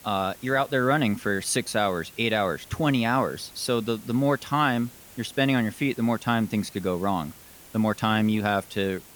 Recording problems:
hiss; faint; throughout; 20 dB below the speech

